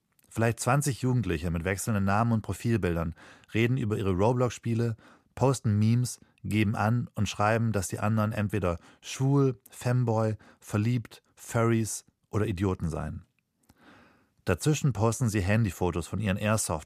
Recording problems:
none

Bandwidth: 15 kHz